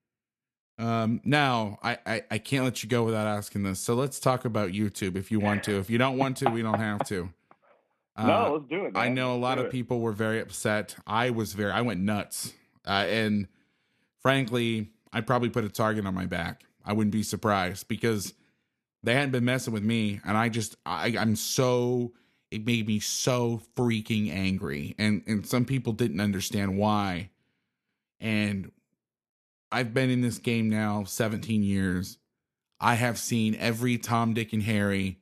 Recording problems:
none

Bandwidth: 14 kHz